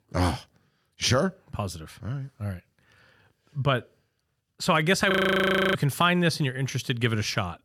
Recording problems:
audio freezing; at 5 s for 0.5 s

